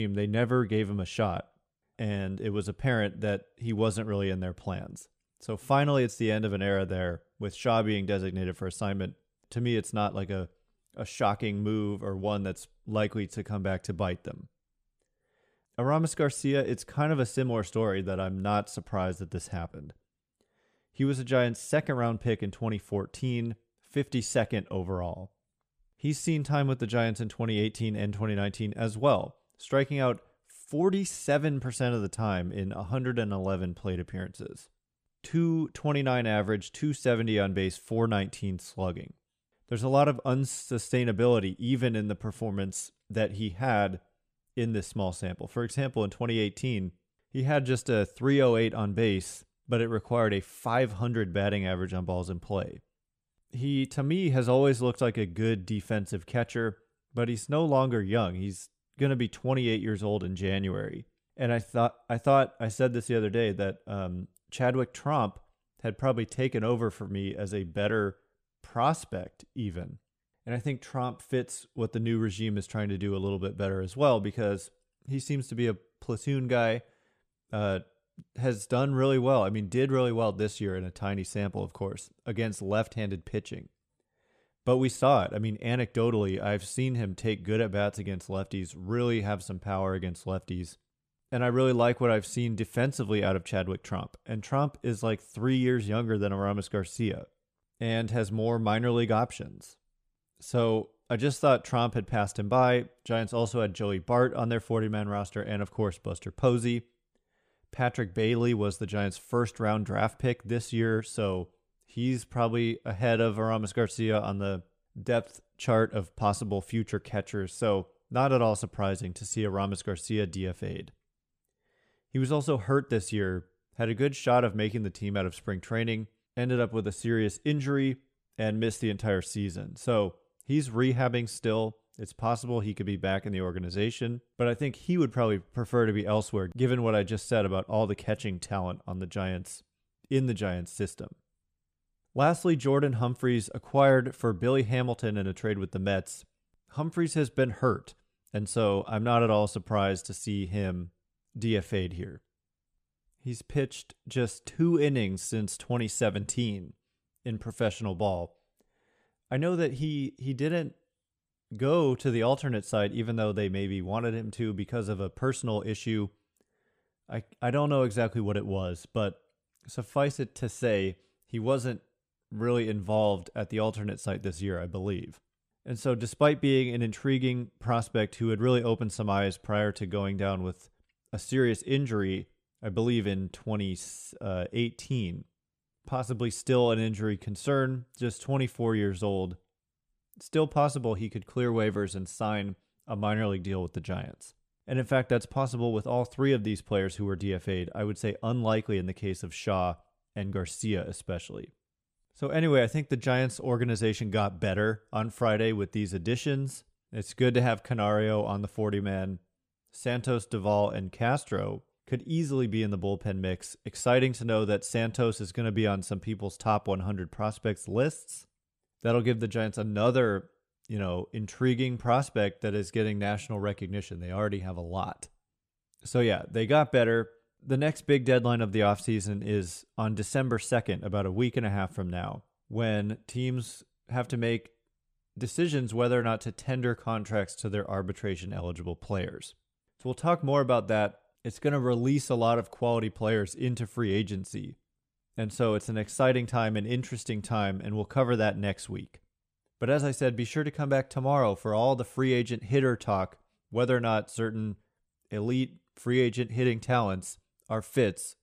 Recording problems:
abrupt cut into speech; at the start

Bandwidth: 14.5 kHz